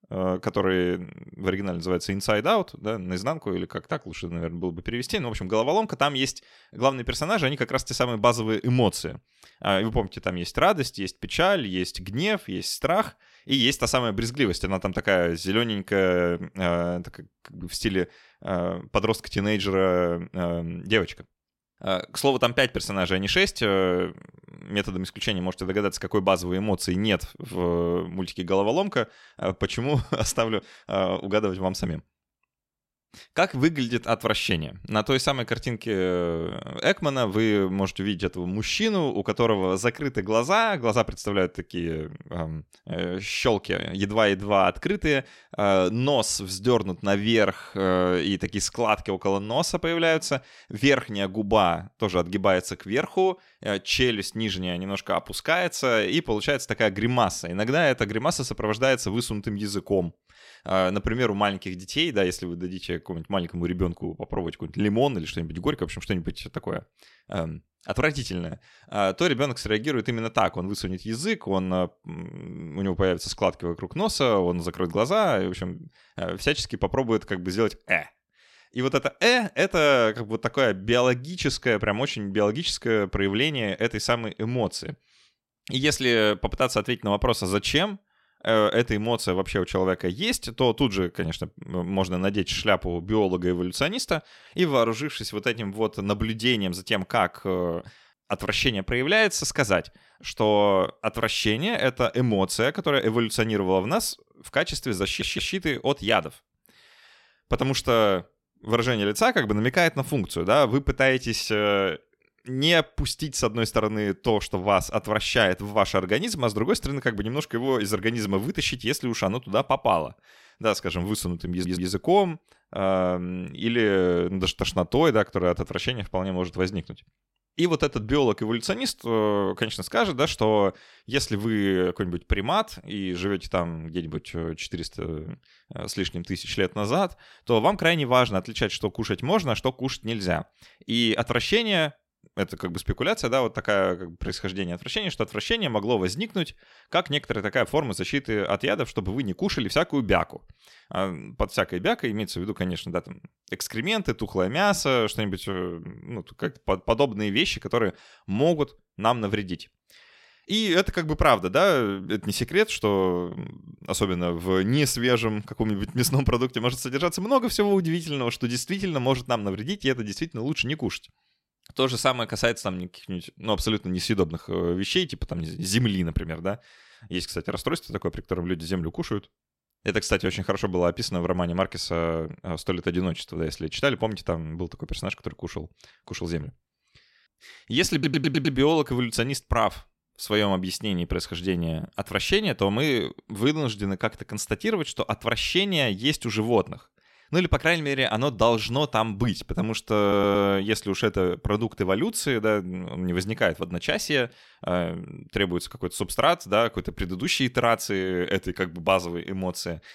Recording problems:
audio stuttering; 4 times, first at 1:45

